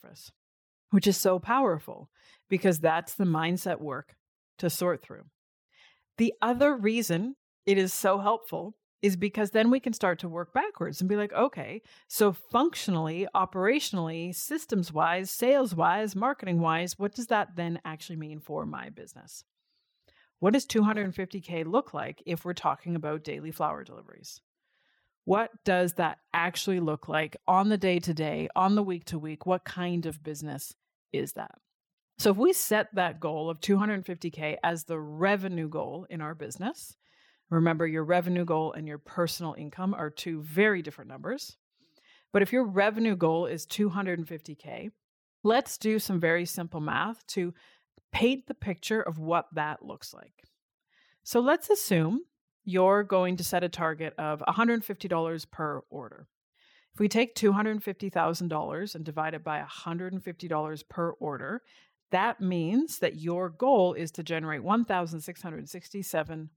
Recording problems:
none

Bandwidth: 17.5 kHz